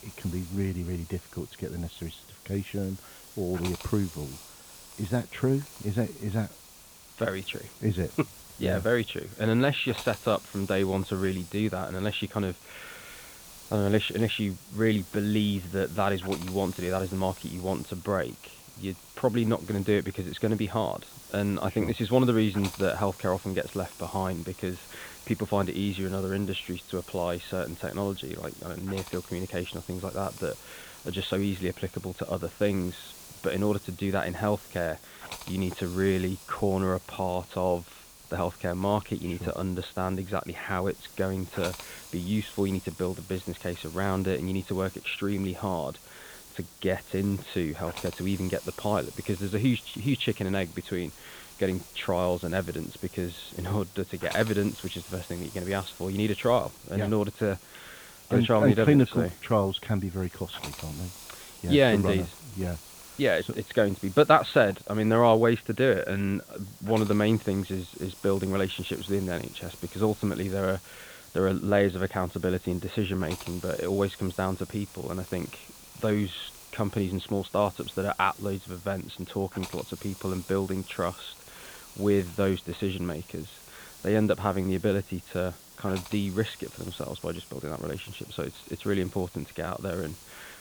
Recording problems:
high frequencies cut off; severe; nothing above 4 kHz
hiss; noticeable; throughout; 15 dB below the speech

